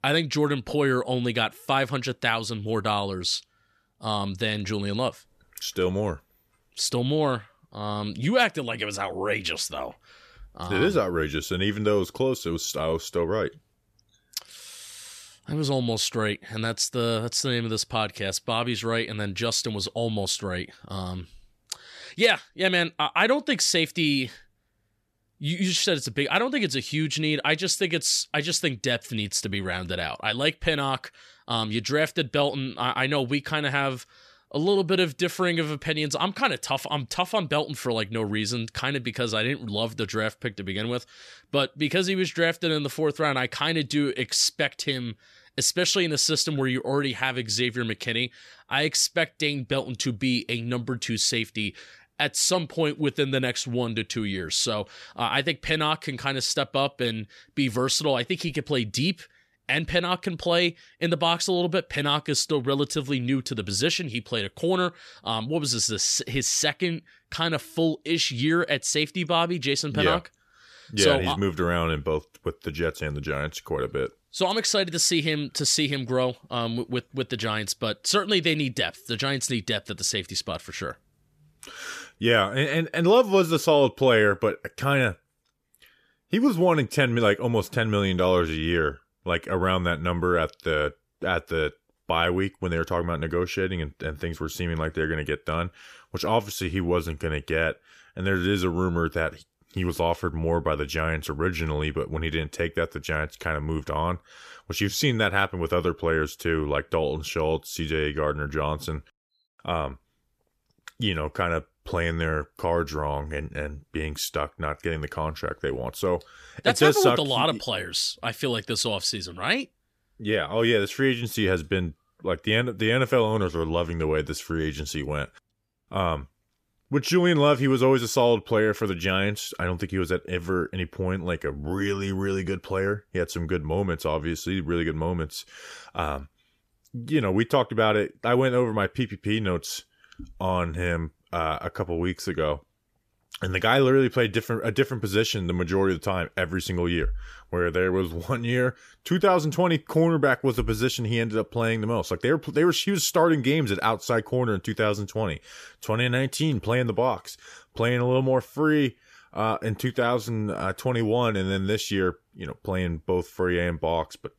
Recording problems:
none

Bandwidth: 14.5 kHz